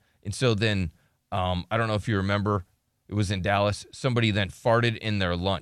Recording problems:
none

